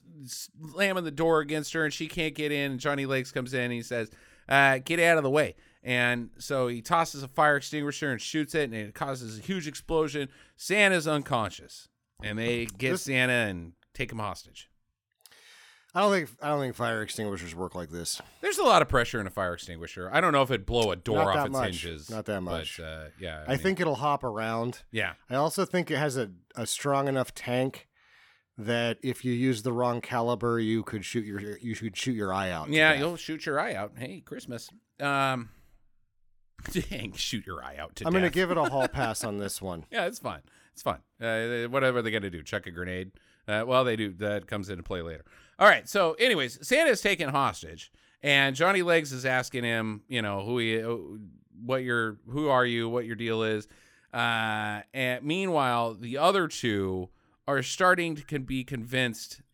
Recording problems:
none

